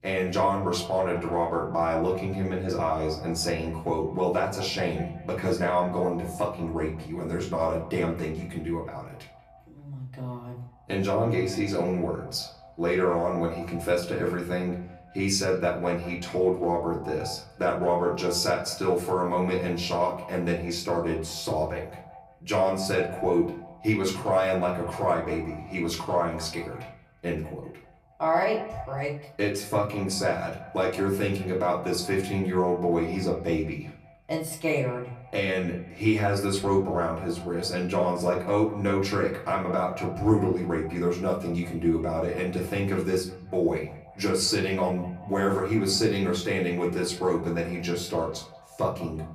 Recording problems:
off-mic speech; far
echo of what is said; noticeable; throughout; 180 ms later, 15 dB below the speech
room echo; slight; dies away in 0.4 s

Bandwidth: 14.5 kHz